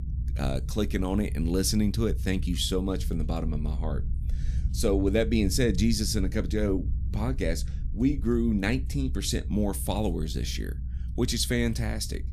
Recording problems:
low rumble; noticeable; throughout; 20 dB below the speech

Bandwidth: 14.5 kHz